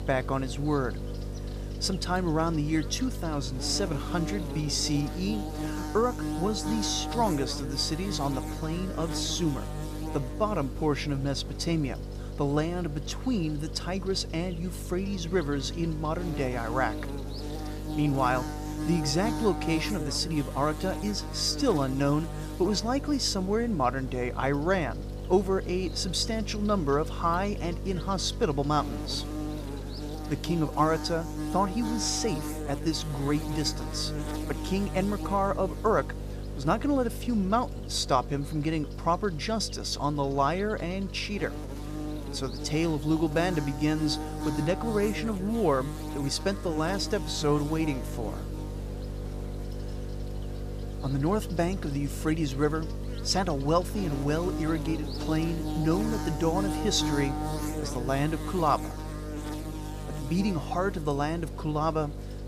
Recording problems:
electrical hum; loud; throughout; 50 Hz, 10 dB below the speech

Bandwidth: 14.5 kHz